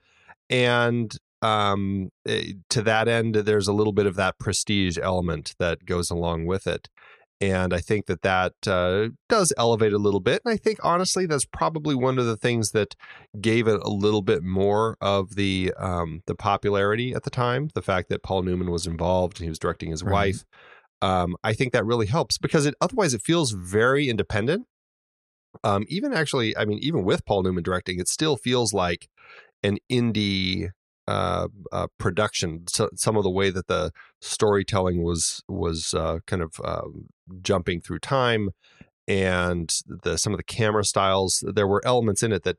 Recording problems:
none

